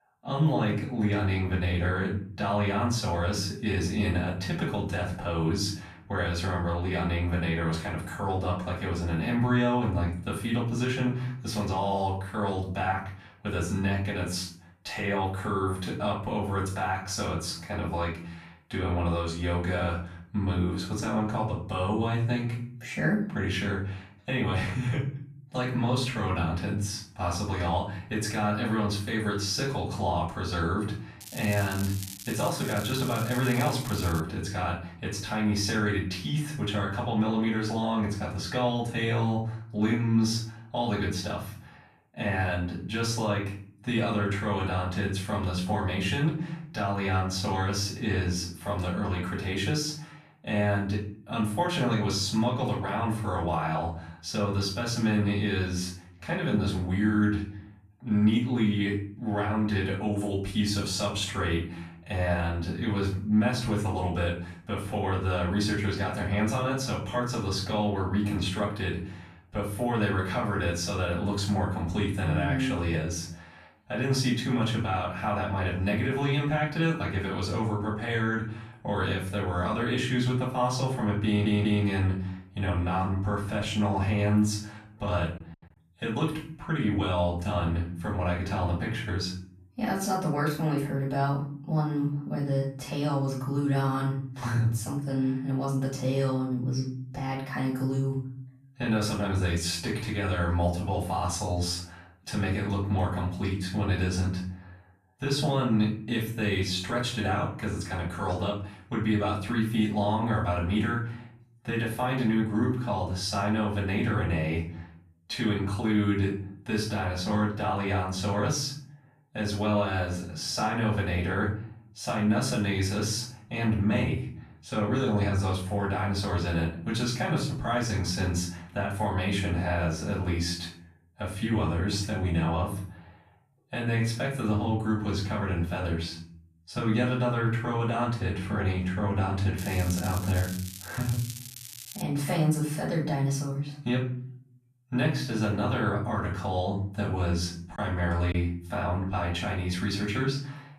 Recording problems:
off-mic speech; far
room echo; noticeable; dies away in 0.5 s
crackling; noticeable; from 31 to 34 s and from 2:20 to 2:22; 10 dB below the speech
audio stuttering; at 1:21
choppy; occasionally; at 2:28; 1% of the speech affected

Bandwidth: 14.5 kHz